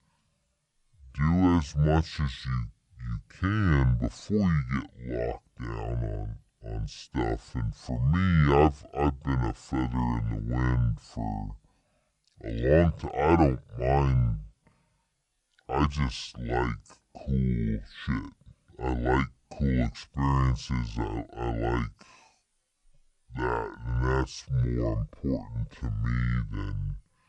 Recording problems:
wrong speed and pitch; too slow and too low; 0.6 times normal speed

